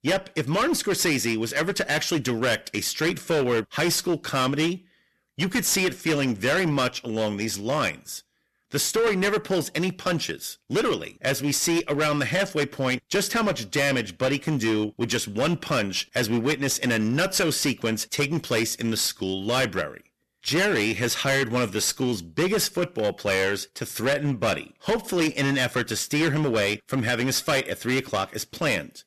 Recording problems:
distortion; heavy; 15% of the sound clipped

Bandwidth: 13.5 kHz